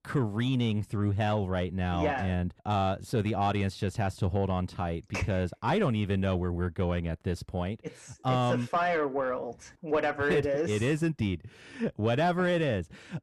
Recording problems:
distortion; slight; 10 dB below the speech

